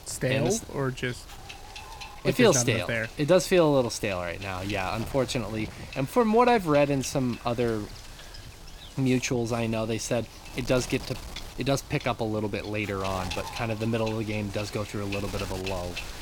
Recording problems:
wind noise on the microphone; occasional gusts; 15 dB below the speech

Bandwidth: 18 kHz